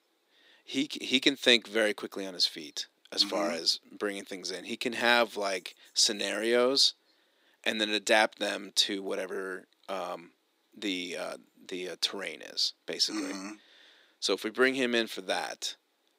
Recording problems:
thin; somewhat; fading below 300 Hz

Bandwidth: 15.5 kHz